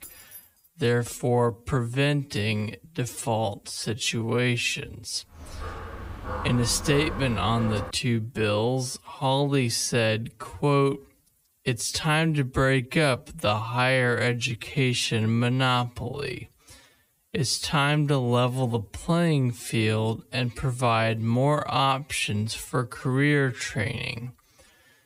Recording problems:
wrong speed, natural pitch; too slow; 0.5 times normal speed
jangling keys; faint; at the start; peak 15 dB below the speech
dog barking; noticeable; from 5.5 to 8 s; peak 8 dB below the speech

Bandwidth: 15.5 kHz